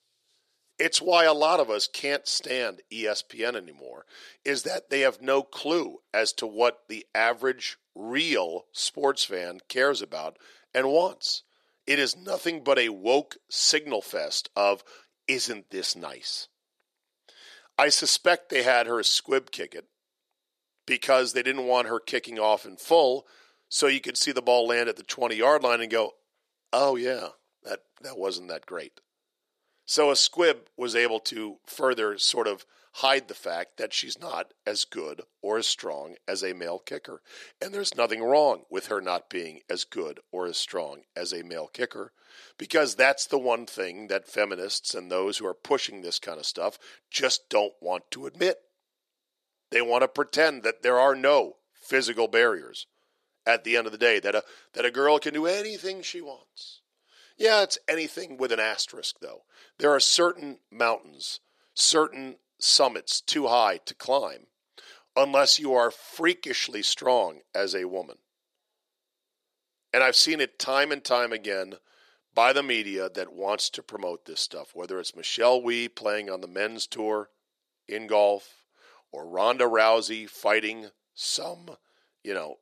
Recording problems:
thin; somewhat; fading below 350 Hz

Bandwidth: 14.5 kHz